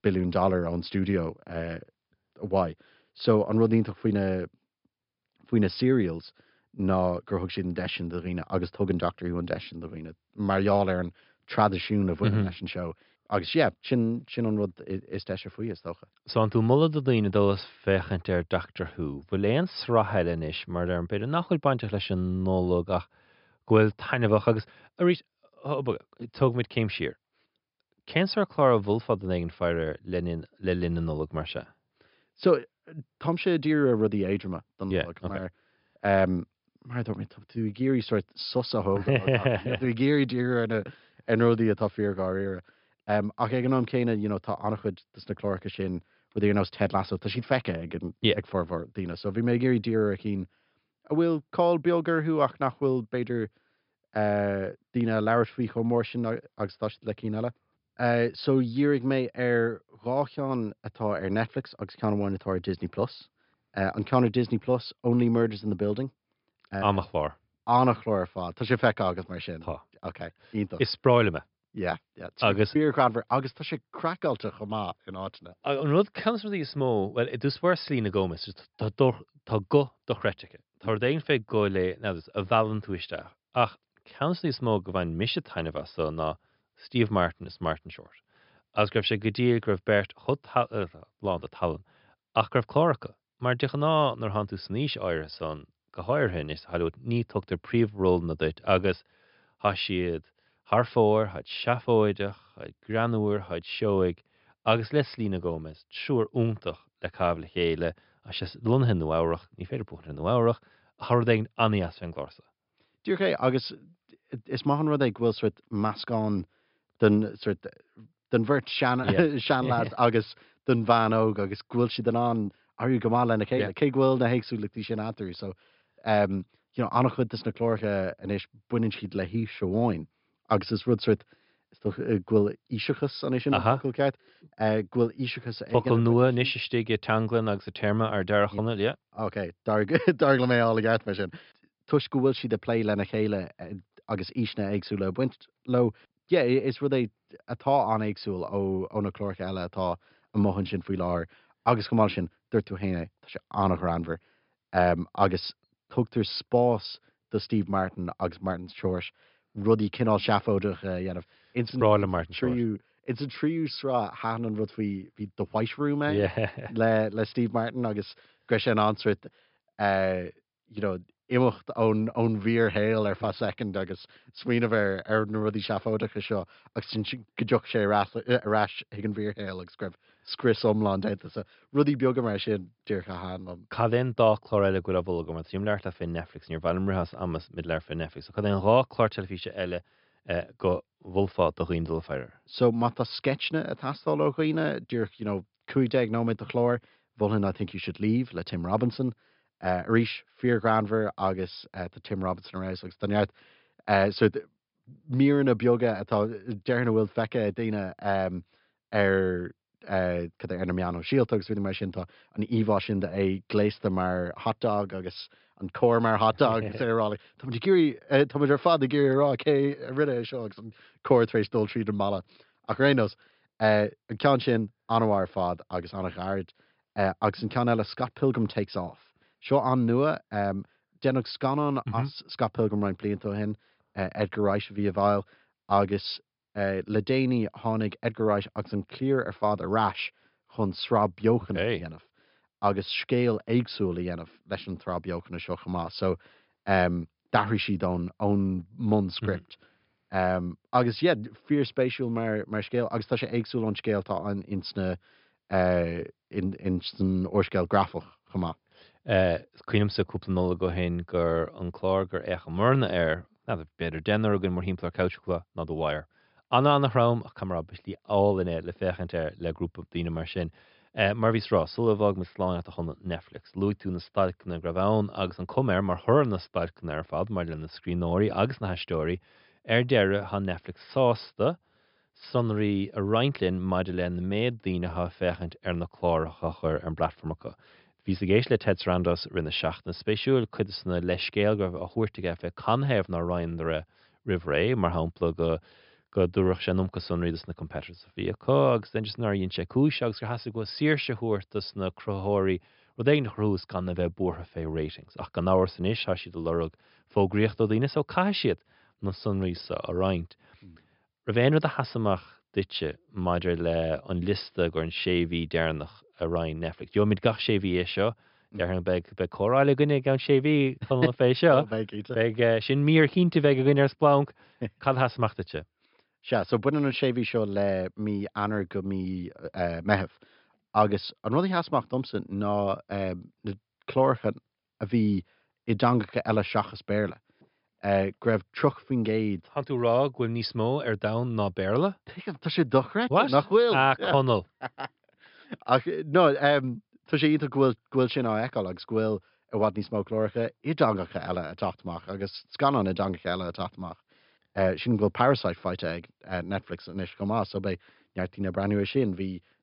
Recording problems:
high frequencies cut off; noticeable; nothing above 5.5 kHz

